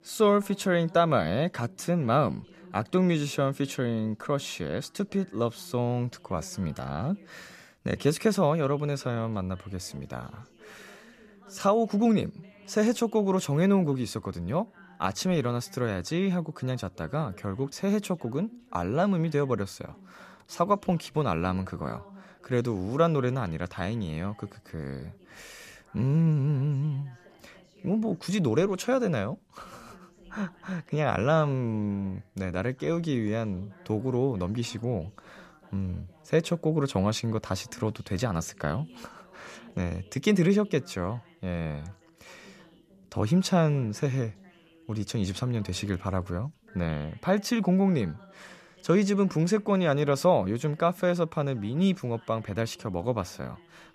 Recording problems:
background chatter; faint; throughout; 2 voices, 25 dB below the speech

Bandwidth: 14.5 kHz